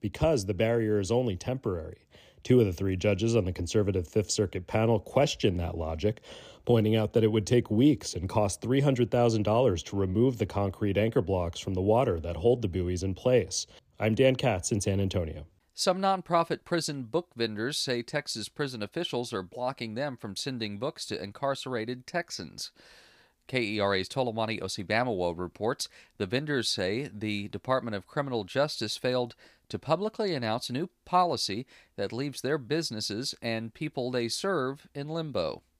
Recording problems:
none

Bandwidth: 15 kHz